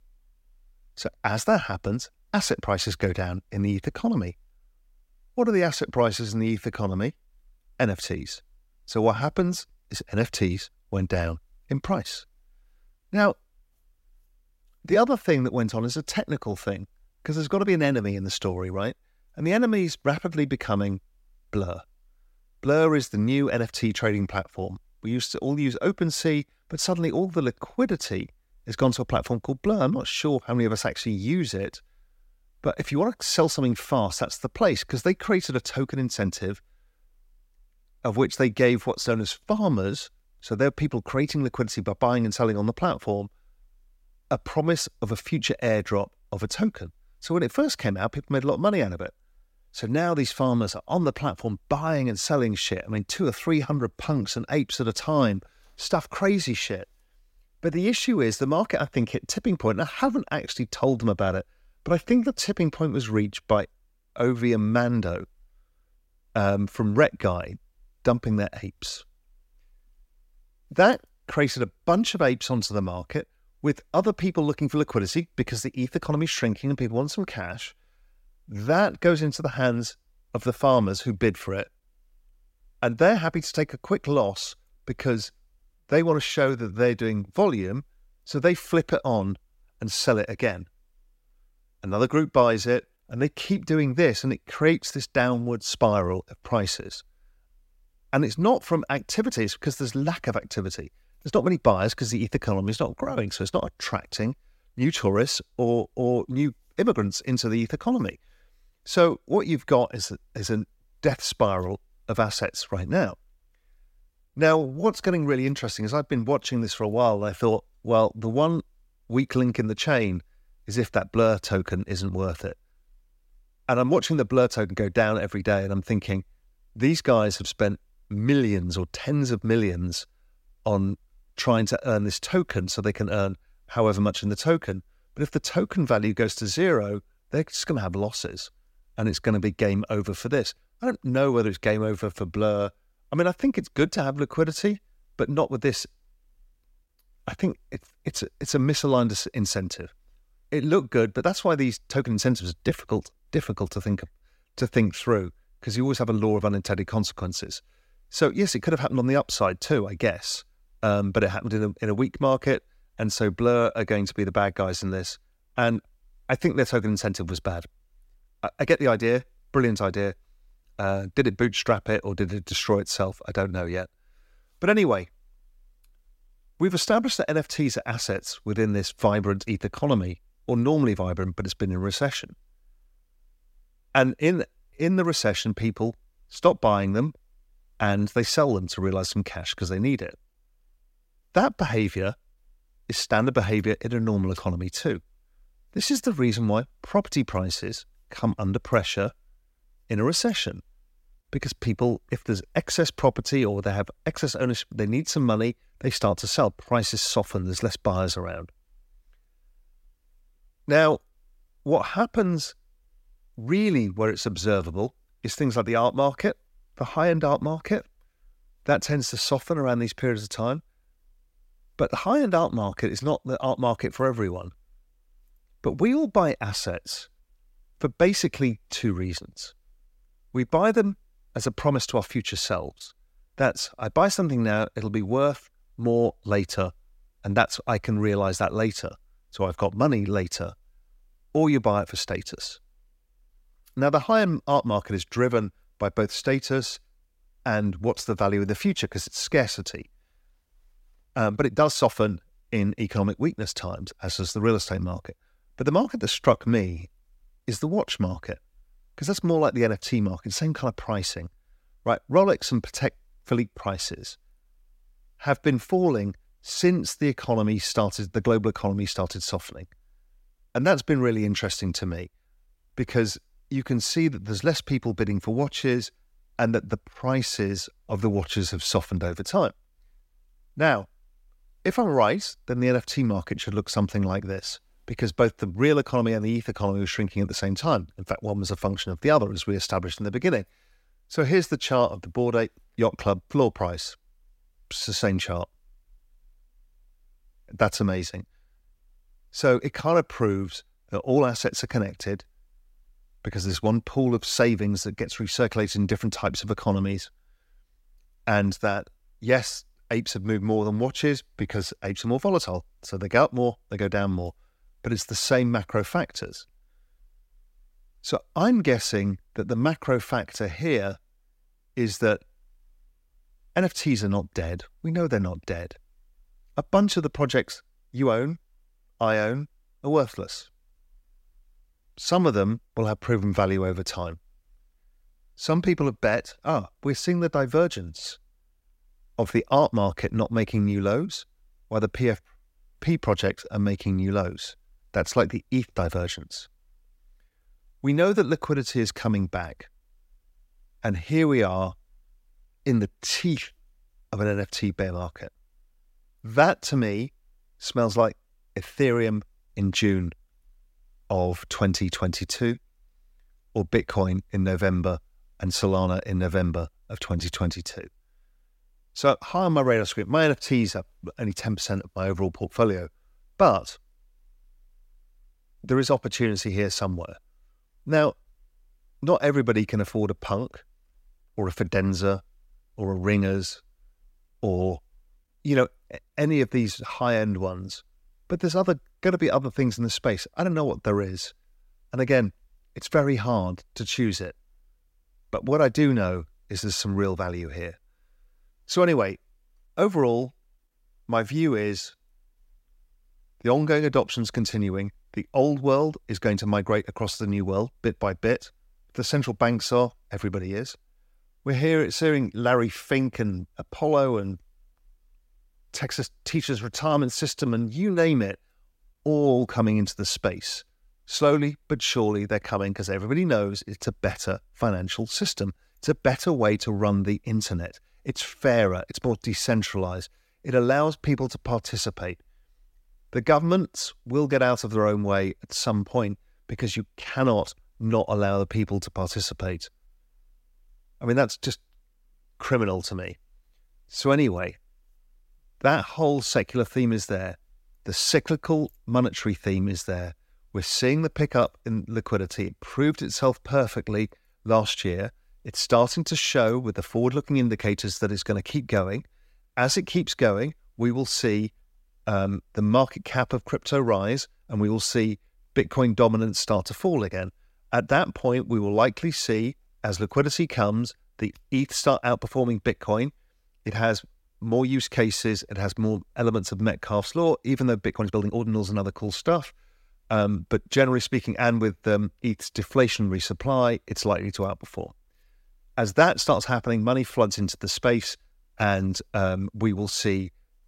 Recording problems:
uneven, jittery; strongly; from 1:42 to 7:58

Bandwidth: 16 kHz